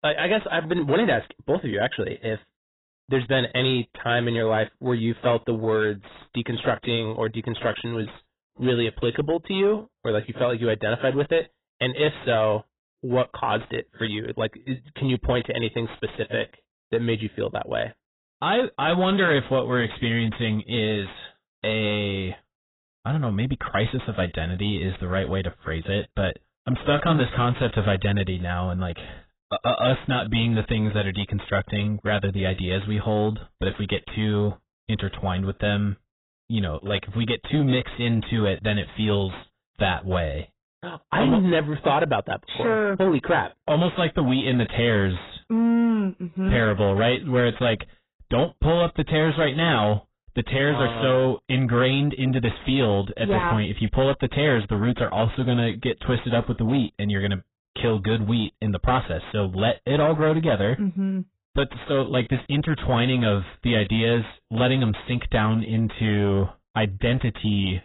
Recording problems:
garbled, watery; badly; nothing above 4 kHz
distortion; slight; 10 dB below the speech

